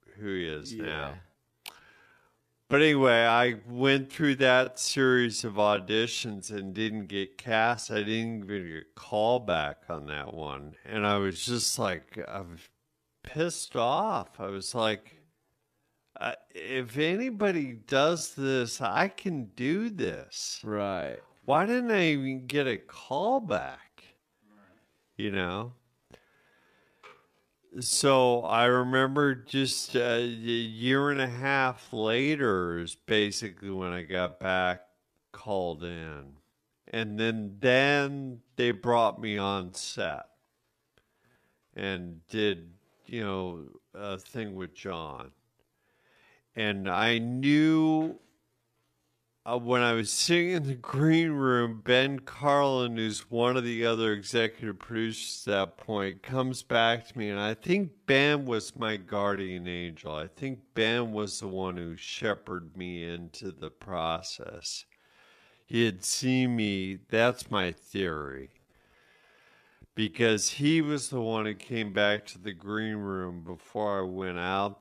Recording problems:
wrong speed, natural pitch; too slow; 0.6 times normal speed

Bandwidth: 14.5 kHz